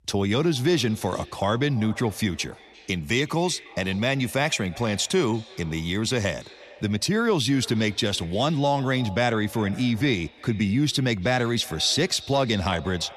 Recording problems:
echo of what is said; faint; throughout; 340 ms later, 20 dB below the speech

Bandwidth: 13.5 kHz